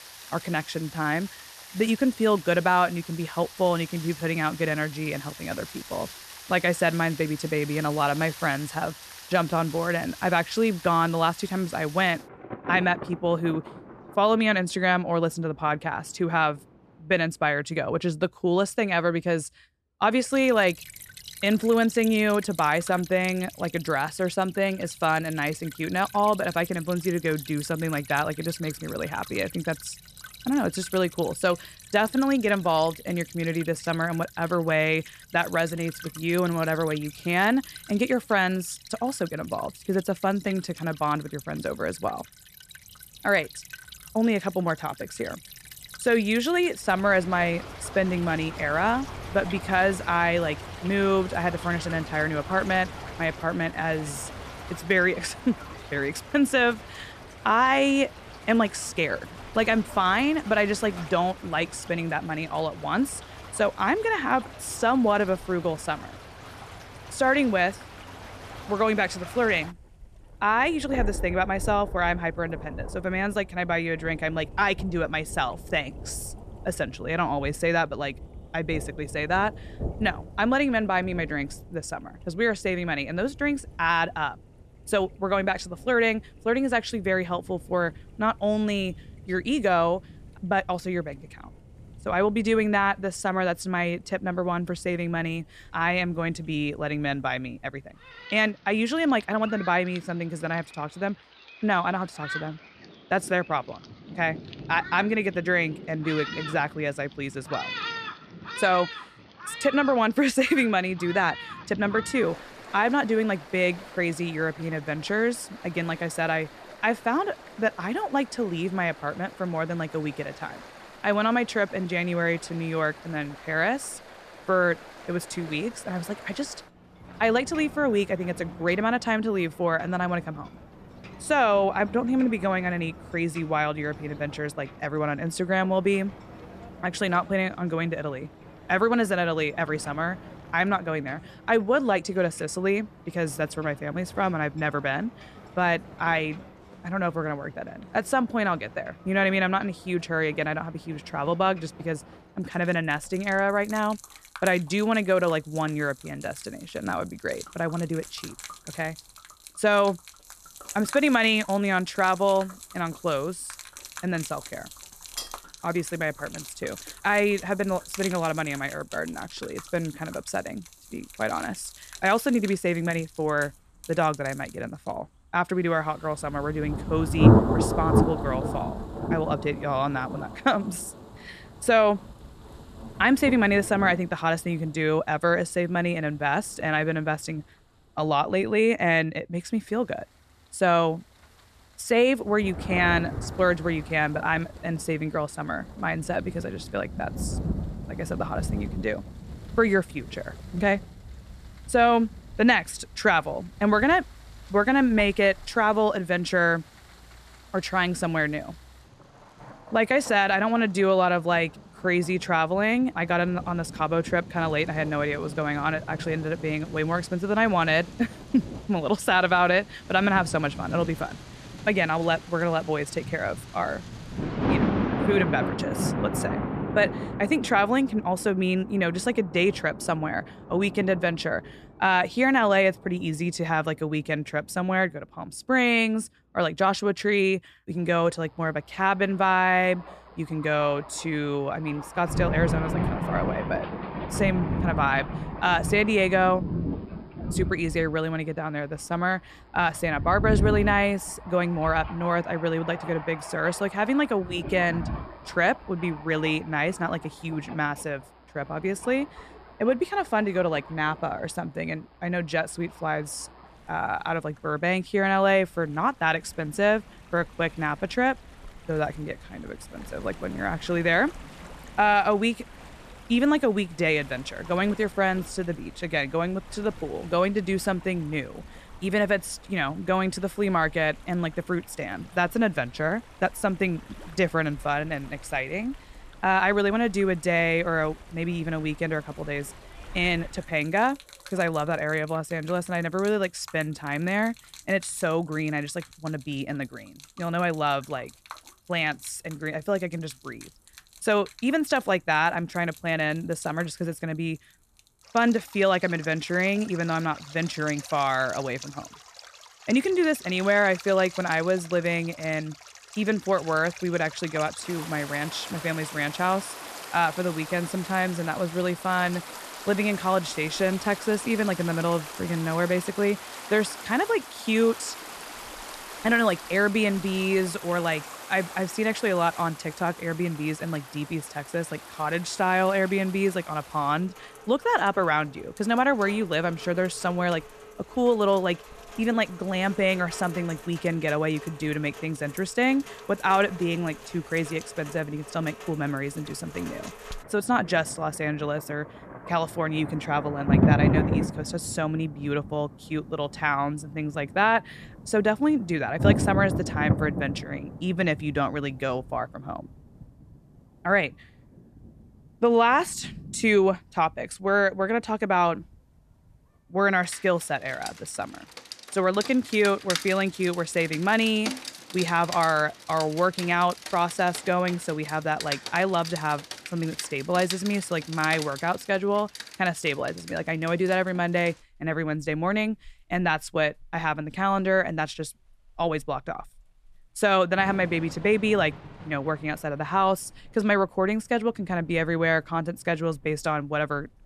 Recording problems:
rain or running water; noticeable; throughout; 10 dB below the speech
clattering dishes; noticeable; at 2:45; peak 10 dB below the speech

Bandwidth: 14 kHz